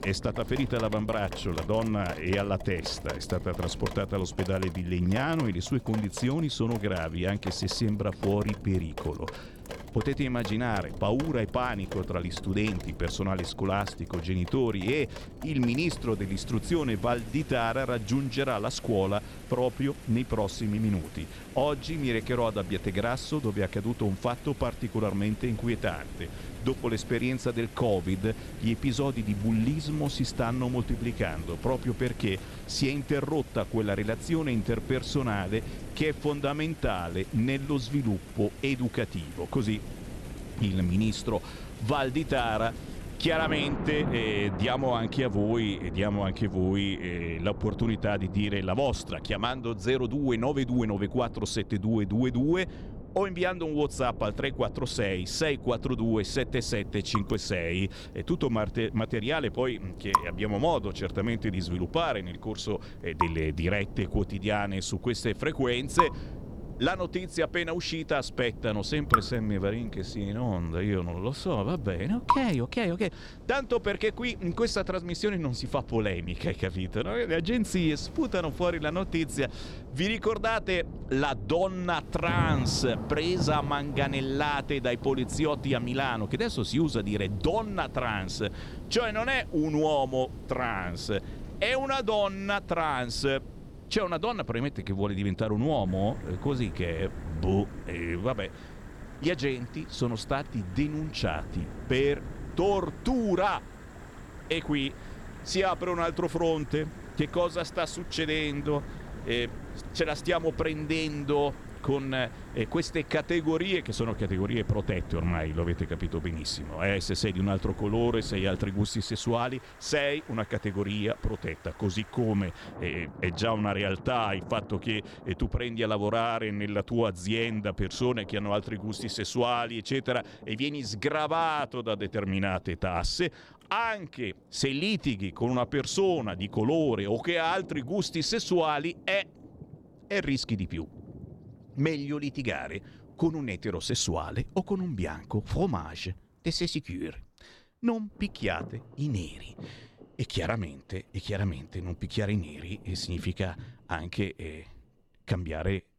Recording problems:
rain or running water; noticeable; throughout; 10 dB below the speech
wind noise on the microphone; occasional gusts; until 1:59; 20 dB below the speech

